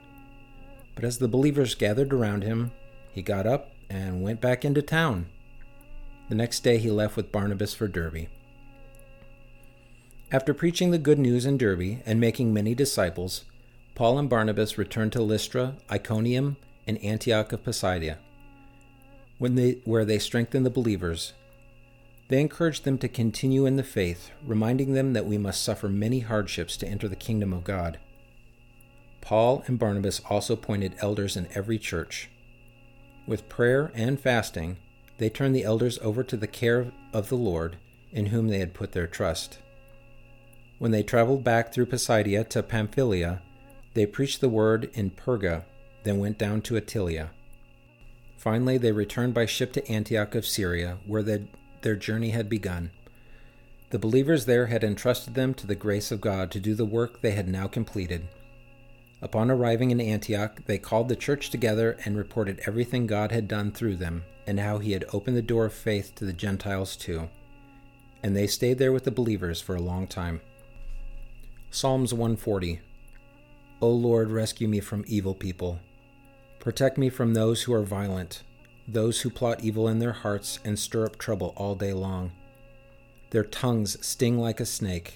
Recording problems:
electrical hum; faint; throughout; 60 Hz, 30 dB below the speech

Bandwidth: 17.5 kHz